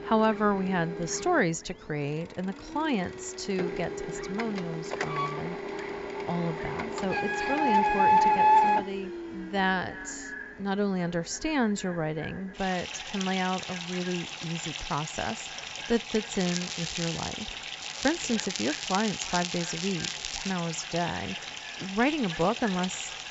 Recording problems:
echo of what is said; noticeable; from 9 s on; 310 ms later, 15 dB below the speech
high frequencies cut off; noticeable; nothing above 7.5 kHz
household noises; loud; throughout; as loud as the speech
crackling; loud; at 16 s and from 18 to 21 s; 4 dB below the speech

